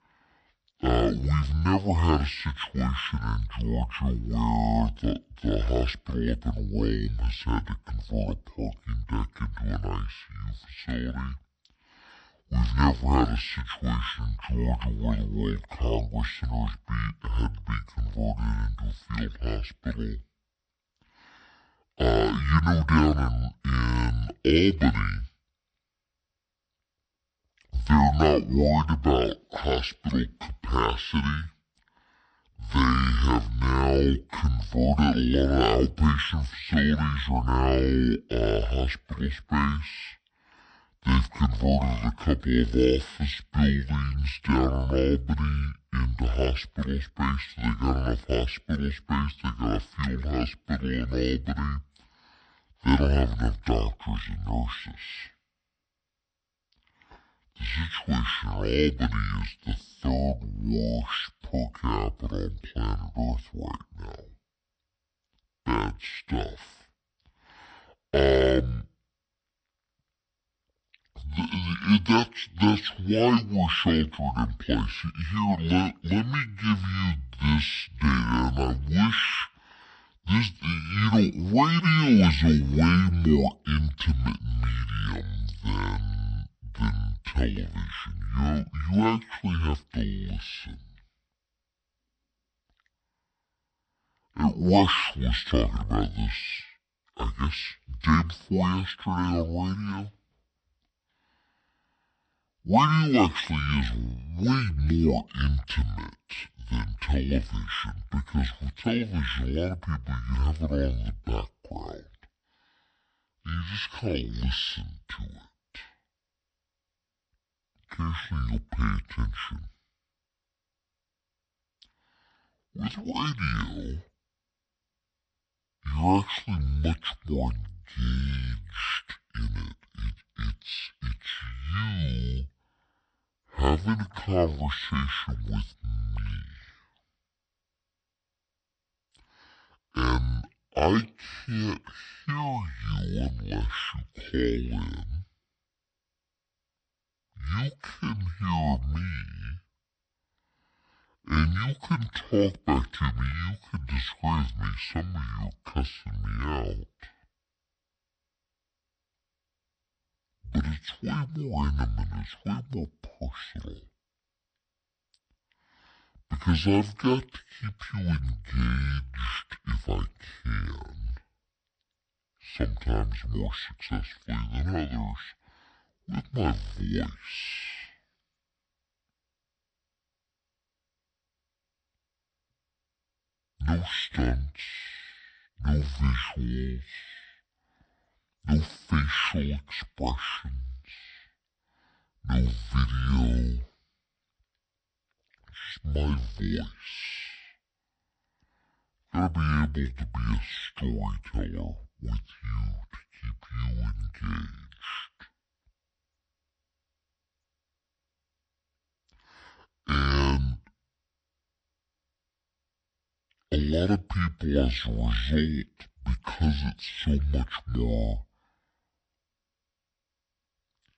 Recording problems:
wrong speed and pitch; too slow and too low; 0.6 times normal speed

